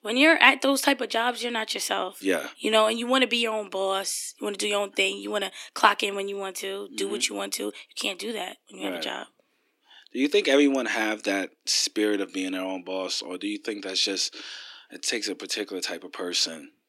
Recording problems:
thin; somewhat; fading below 300 Hz

